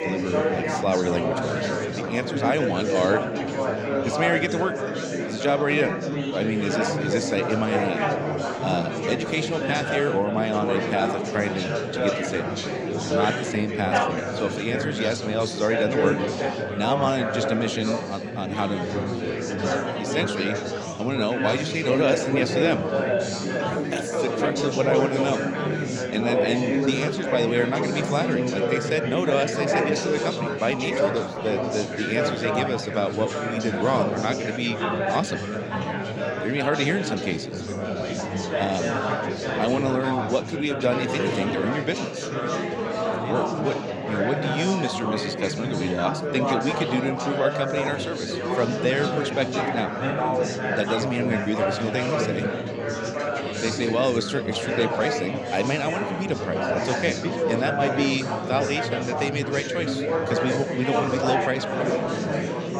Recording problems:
chatter from many people; very loud; throughout; as loud as the speech

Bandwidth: 16.5 kHz